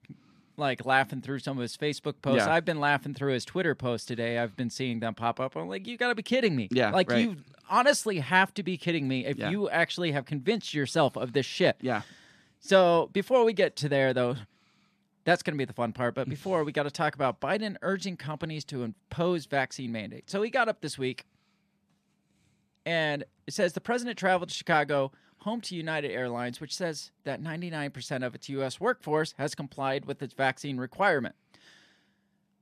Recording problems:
none

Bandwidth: 14.5 kHz